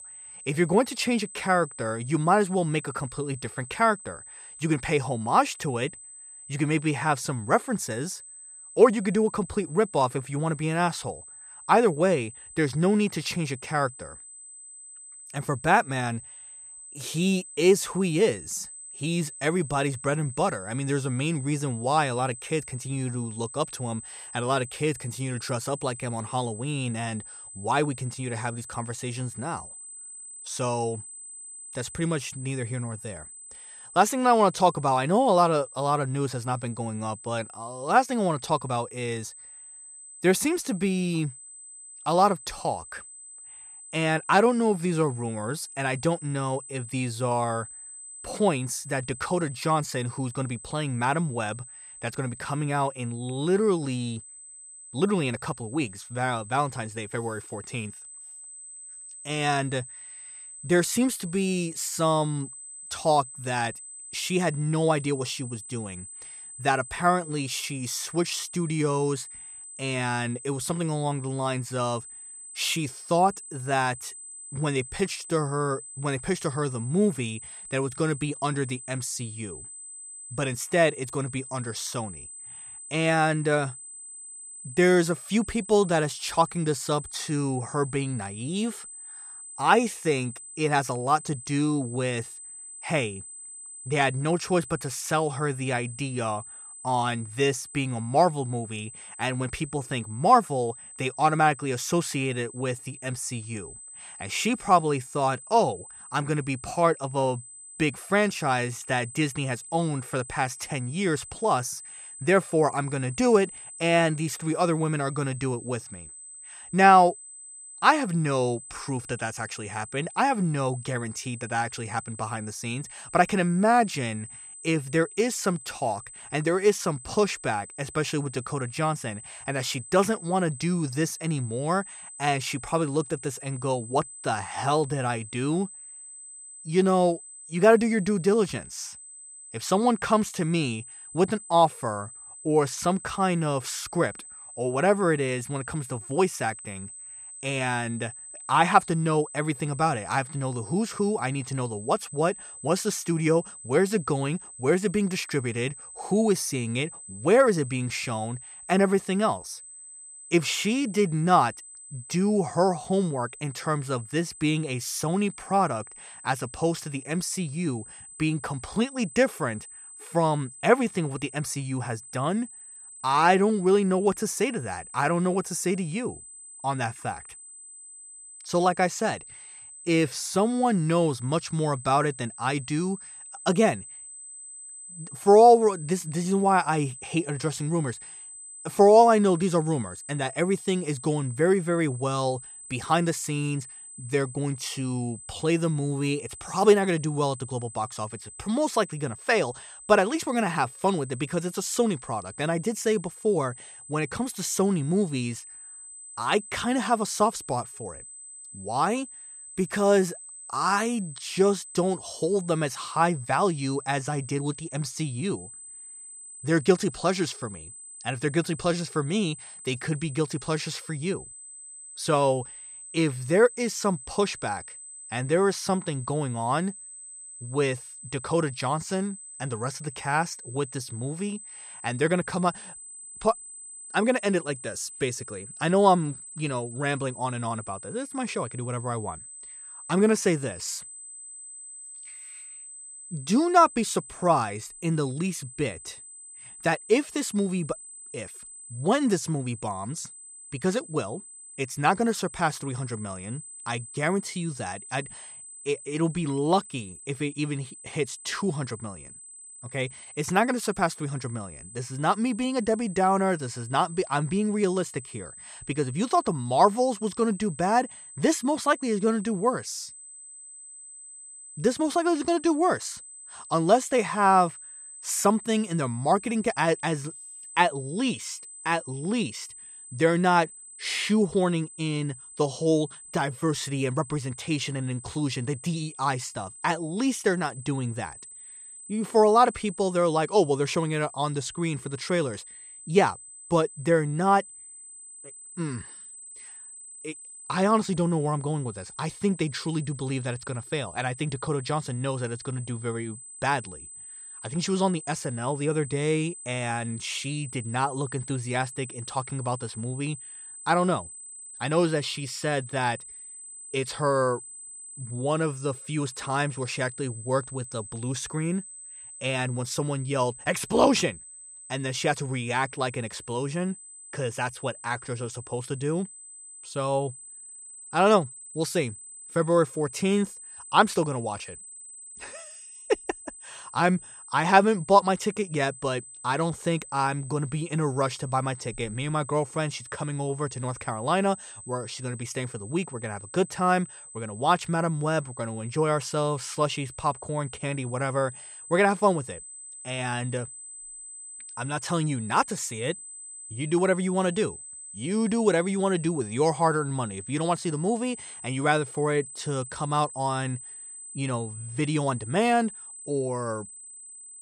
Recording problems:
high-pitched whine; noticeable; throughout; 8 kHz, 15 dB below the speech

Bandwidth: 14 kHz